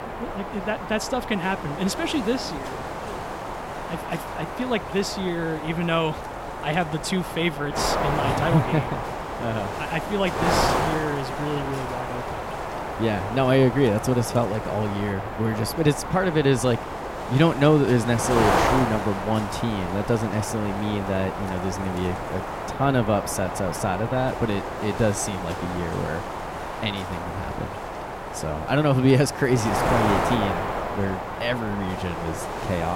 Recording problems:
wind noise on the microphone; heavy; 1 dB below the speech
abrupt cut into speech; at the end

